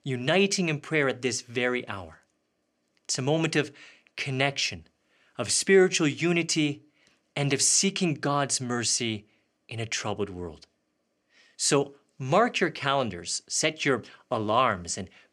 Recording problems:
none

